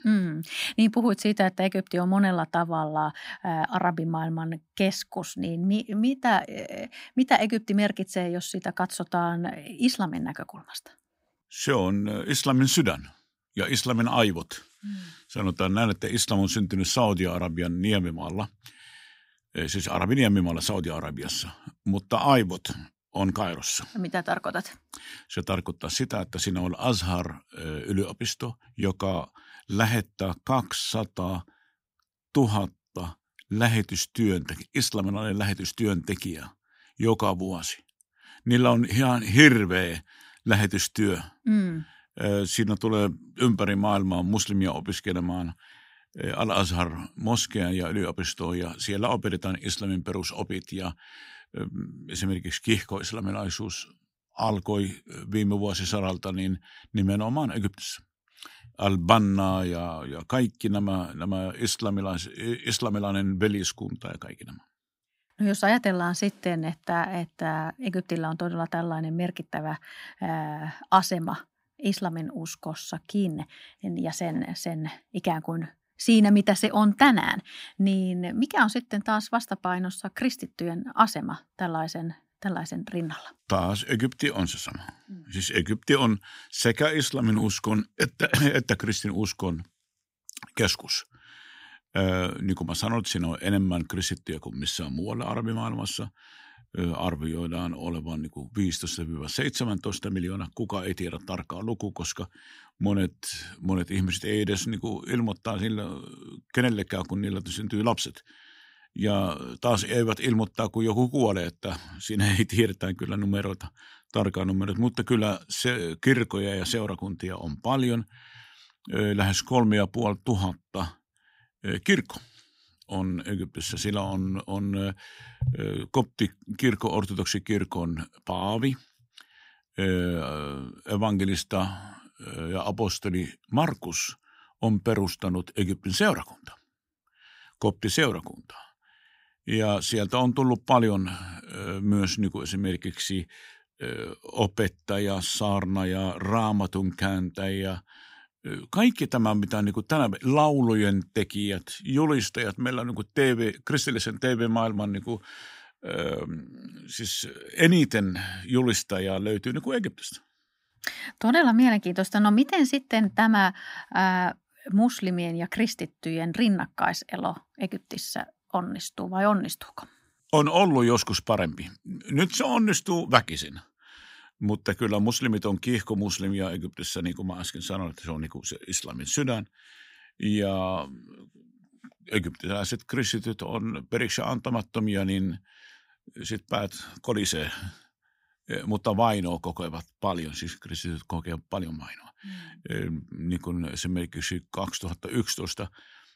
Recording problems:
none

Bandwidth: 15.5 kHz